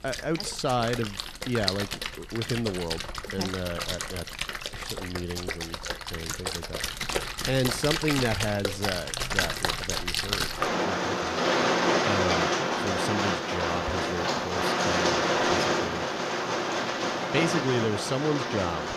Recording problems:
rain or running water; very loud; throughout; 3 dB above the speech

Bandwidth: 14.5 kHz